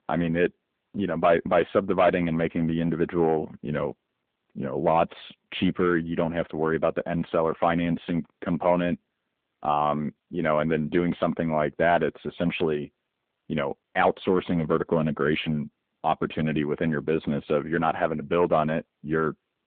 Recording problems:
phone-call audio
distortion; slight; 3% of the sound clipped

